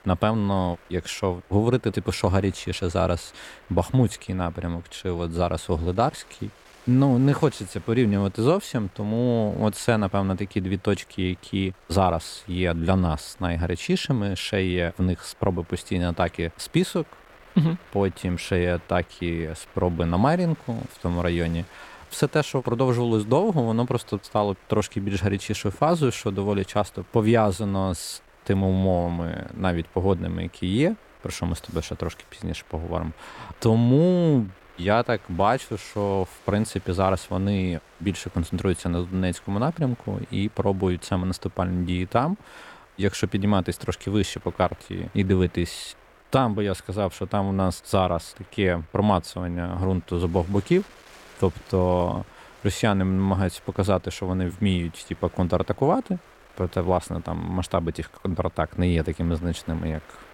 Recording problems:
wind noise on the microphone; occasional gusts; 25 dB below the speech

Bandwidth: 16.5 kHz